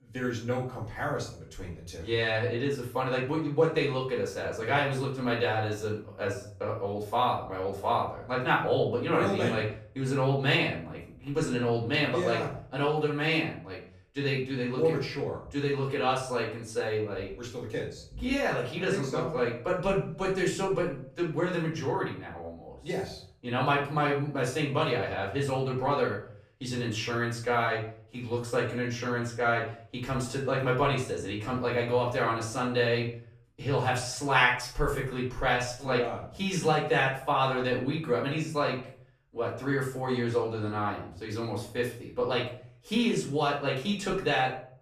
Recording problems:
off-mic speech; far
room echo; noticeable; dies away in 0.4 s

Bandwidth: 14.5 kHz